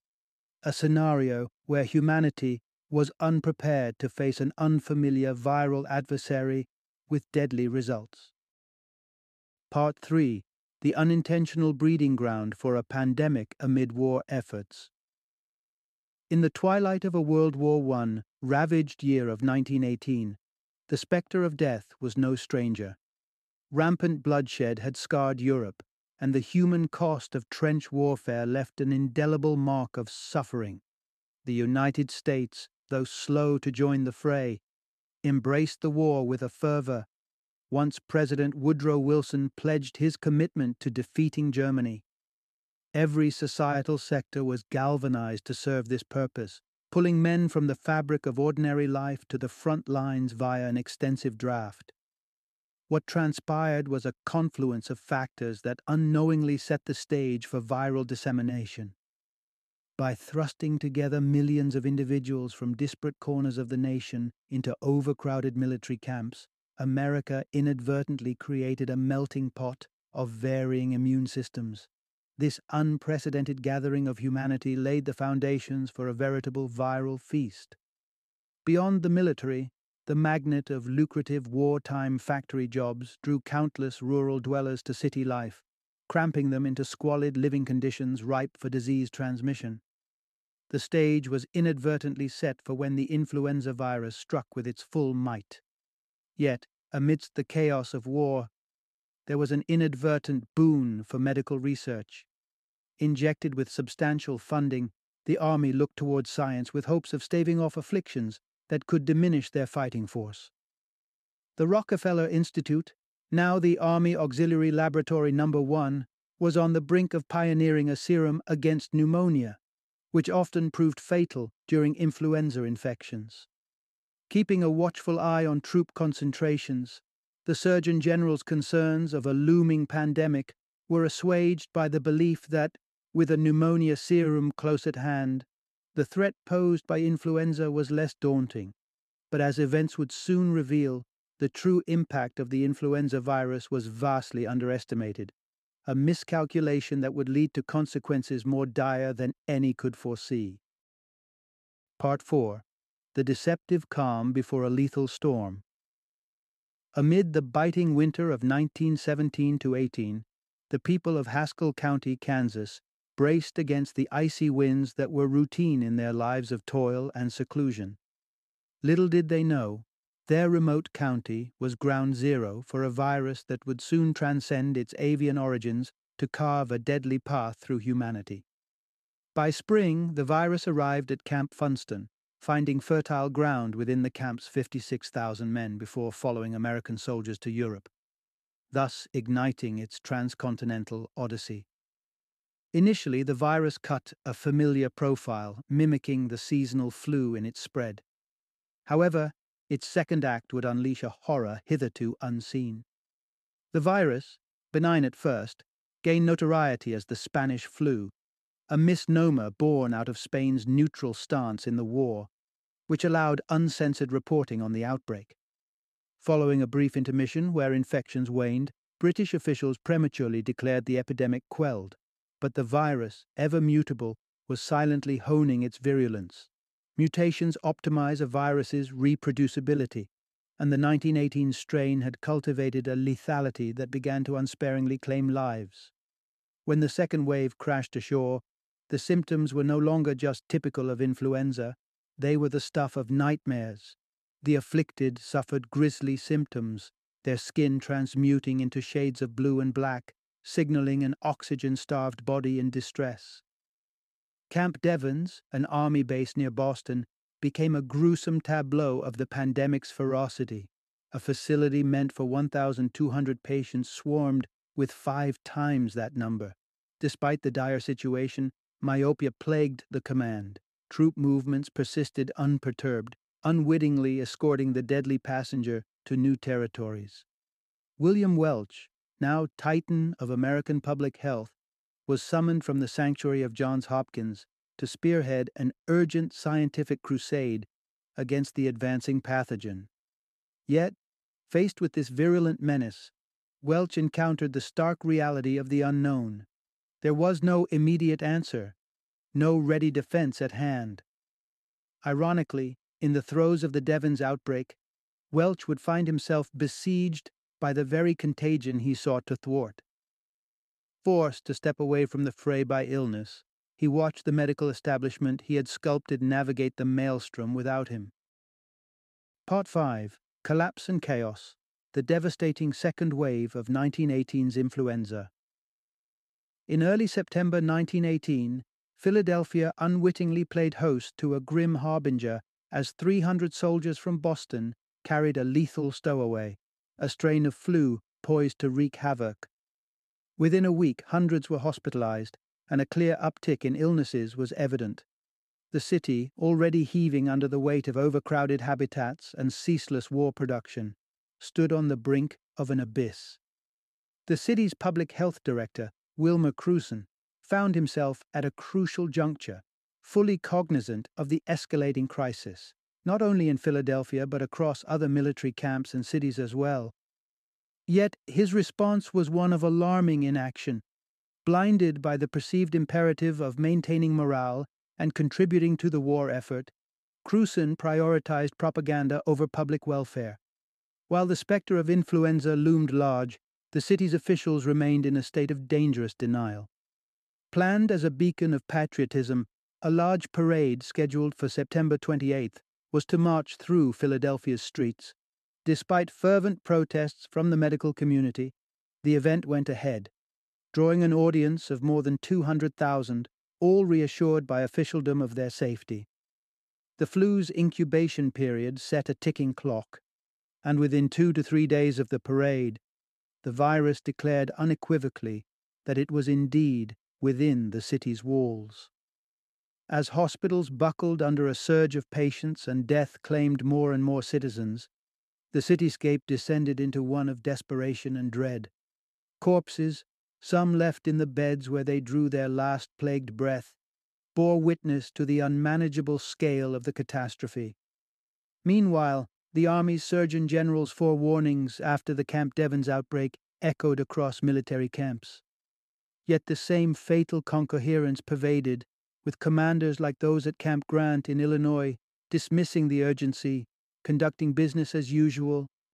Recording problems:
none

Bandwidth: 13.5 kHz